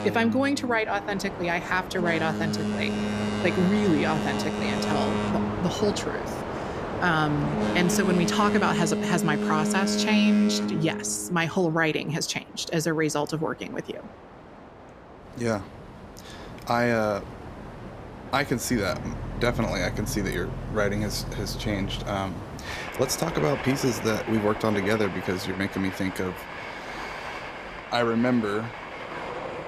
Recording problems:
train or aircraft noise; loud; throughout; 5 dB below the speech

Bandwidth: 14.5 kHz